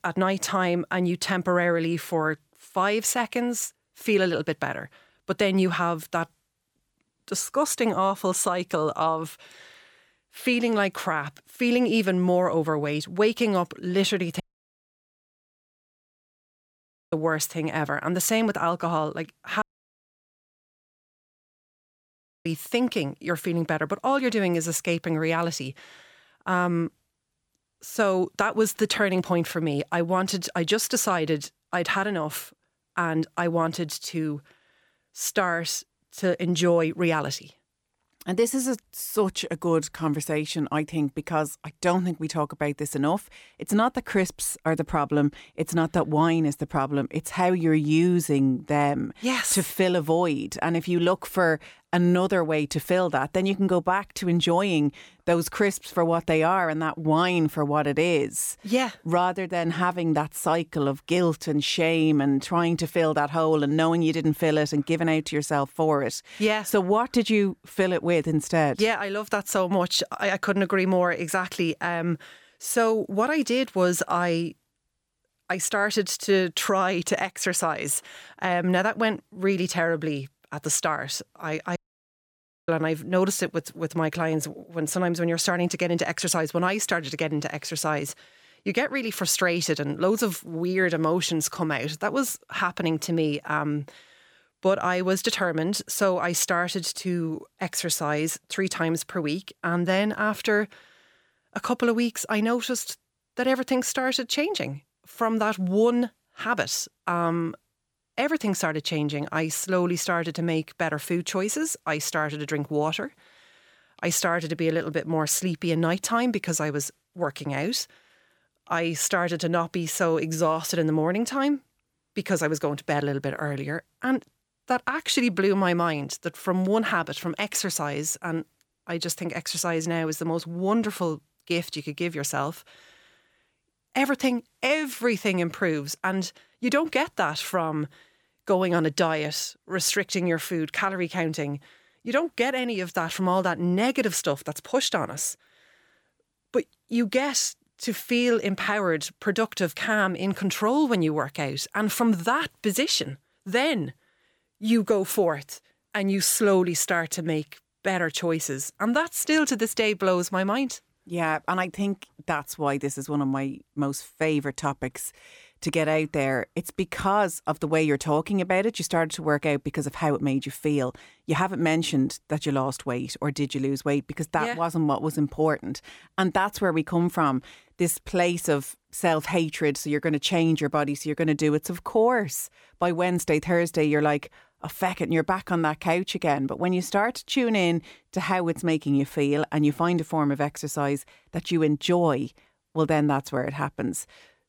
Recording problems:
audio cutting out; at 14 s for 2.5 s, at 20 s for 3 s and at 1:22 for 1 s

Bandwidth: 18.5 kHz